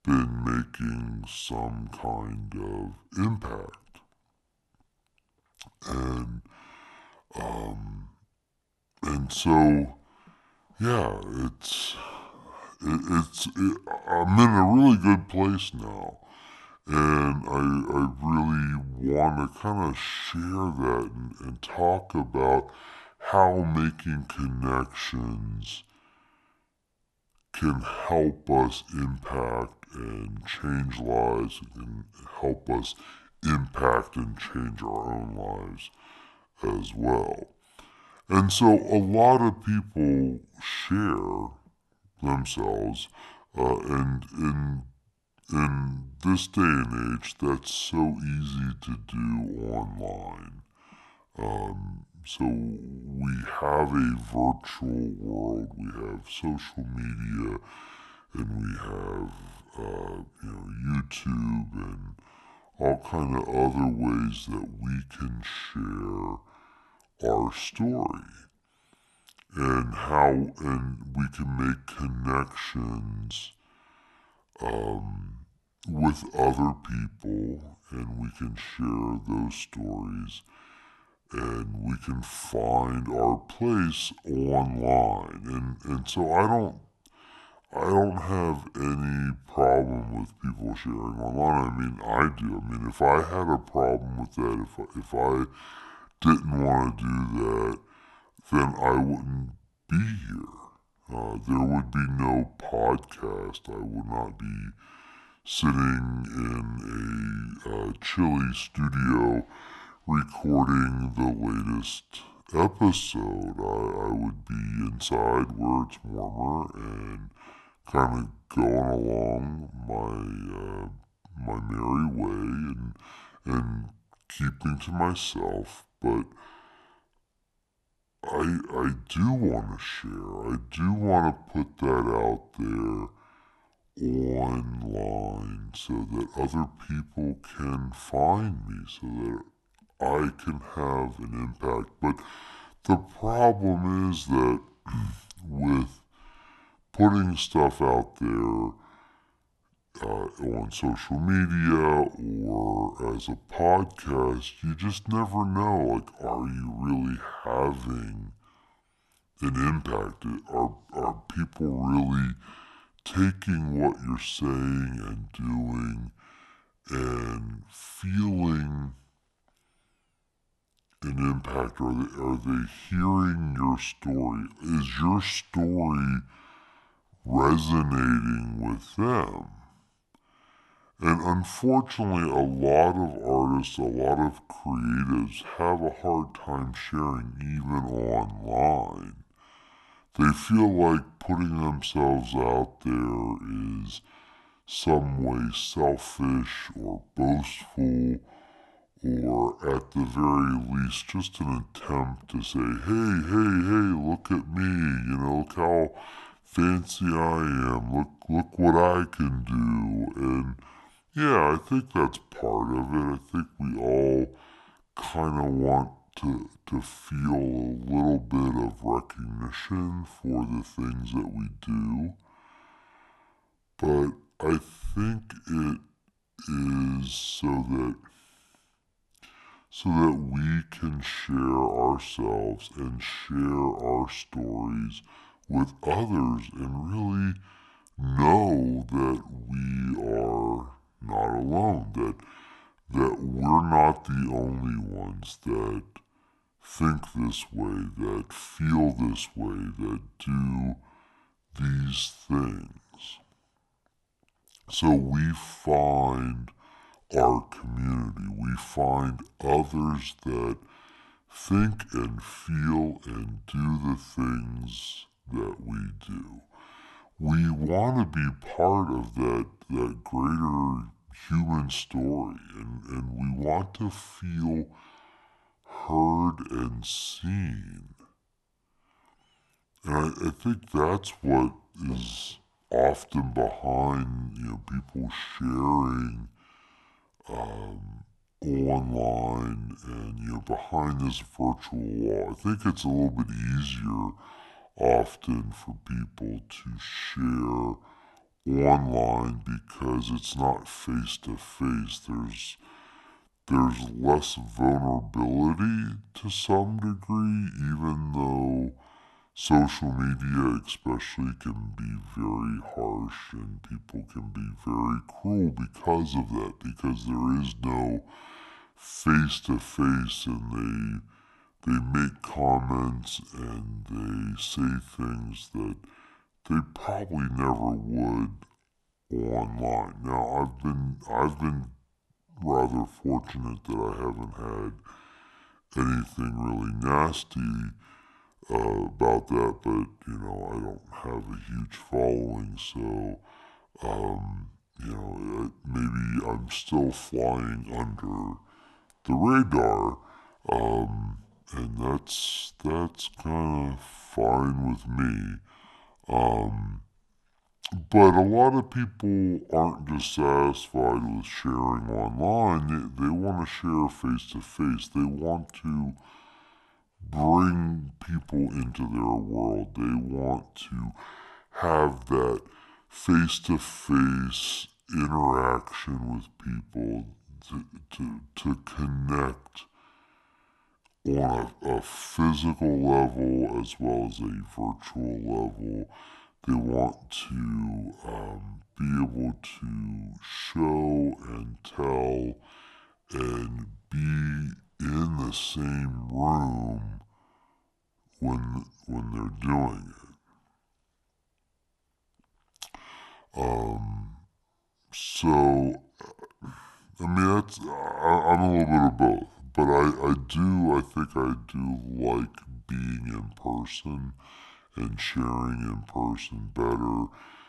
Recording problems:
wrong speed and pitch; too slow and too low; 0.7 times normal speed

